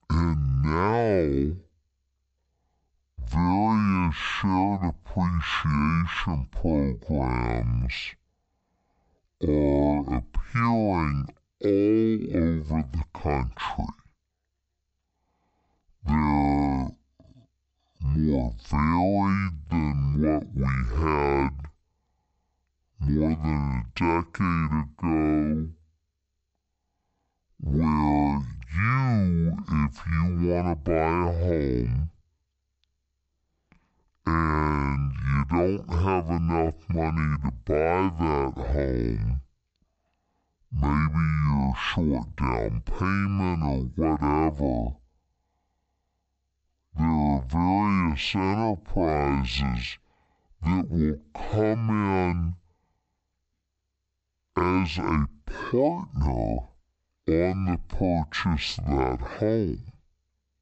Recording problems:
wrong speed and pitch; too slow and too low; 0.5 times normal speed

